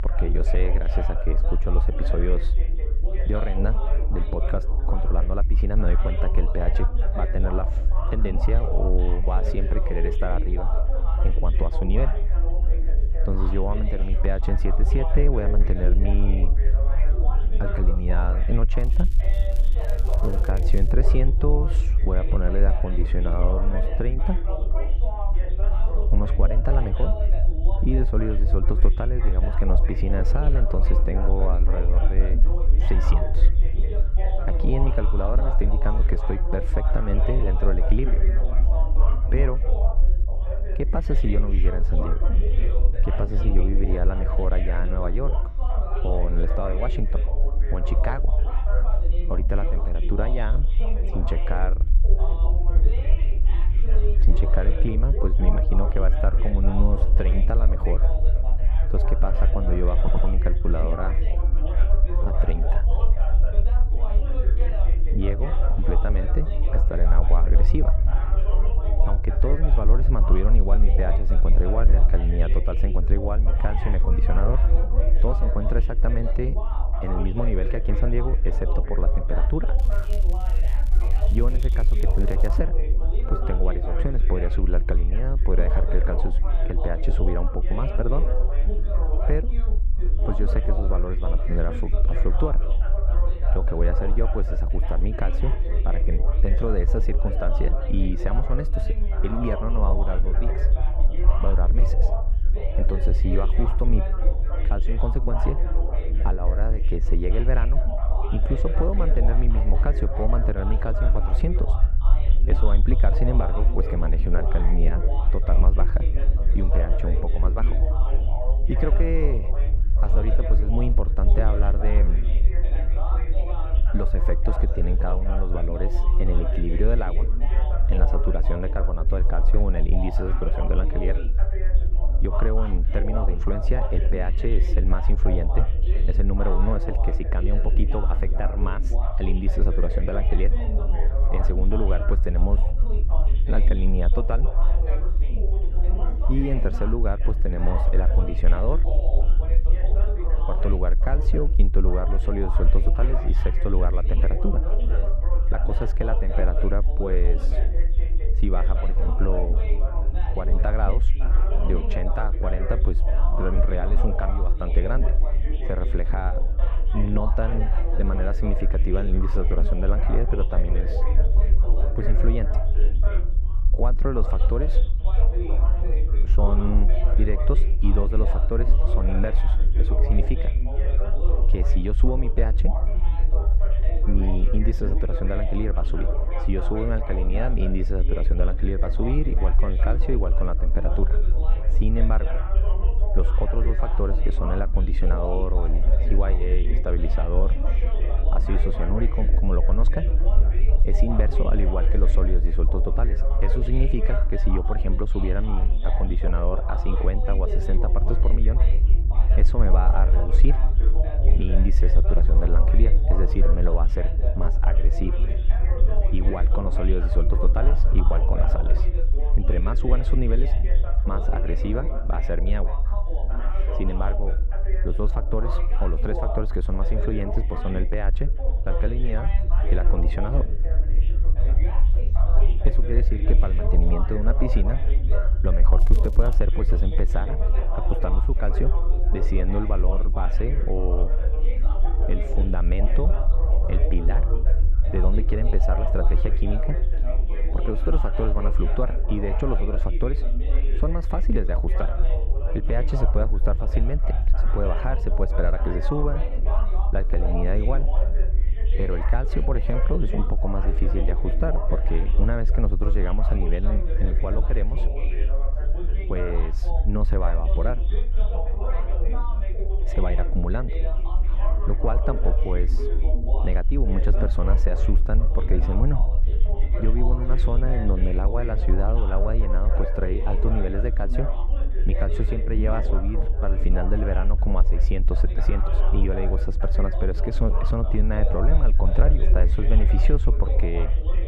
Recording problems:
muffled; very; fading above 3.5 kHz
background chatter; loud; throughout; 3 voices, 7 dB below the speech
low rumble; noticeable; throughout; 15 dB below the speech
crackling; faint; from 19 to 21 s, from 1:20 to 1:23 and at 3:56; 20 dB below the speech
audio stuttering; at 1:00

